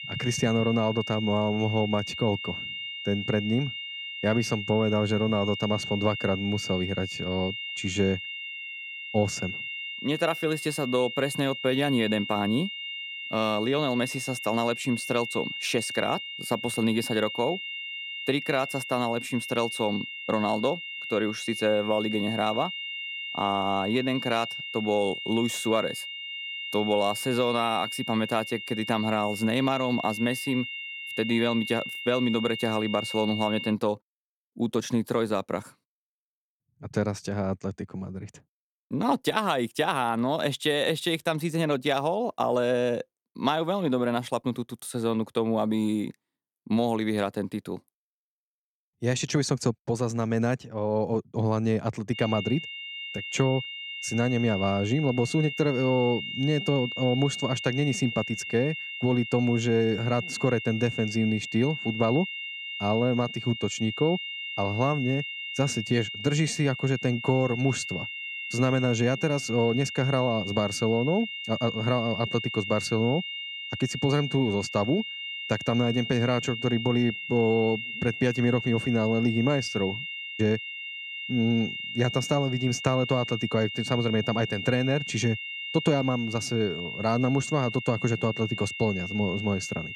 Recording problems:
high-pitched whine; loud; until 34 s and from 52 s on; 3 kHz, 6 dB below the speech

